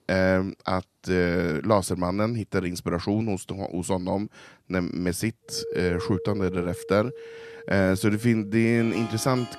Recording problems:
background music; noticeable; from 5.5 s on; 10 dB below the speech

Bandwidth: 13.5 kHz